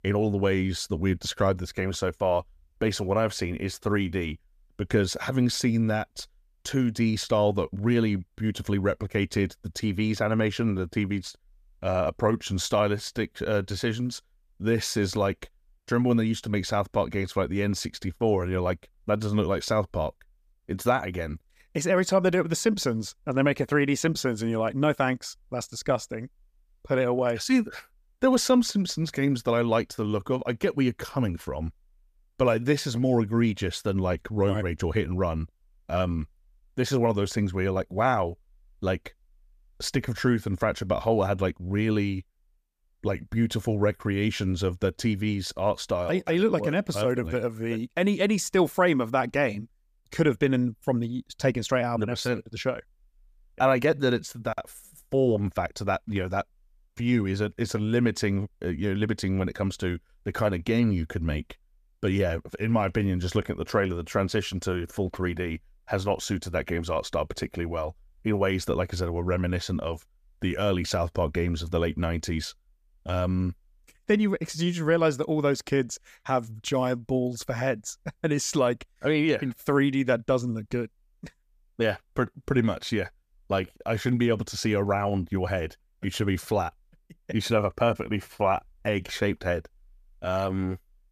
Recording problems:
none

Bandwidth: 15 kHz